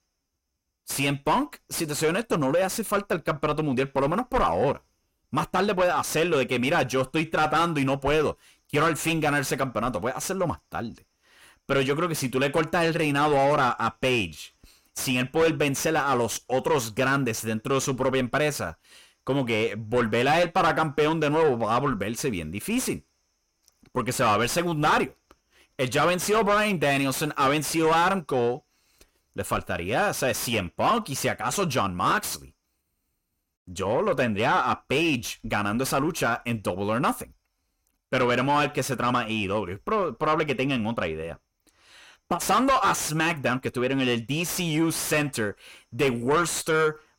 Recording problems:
distortion; heavy; 7 dB below the speech

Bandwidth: 16.5 kHz